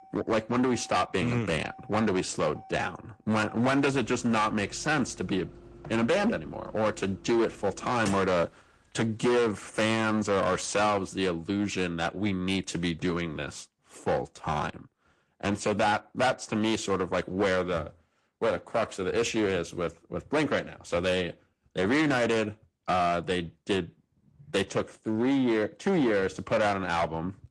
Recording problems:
distortion; heavy; 11% of the sound clipped
garbled, watery; slightly
traffic noise; faint; until 11 s; 25 dB below the speech

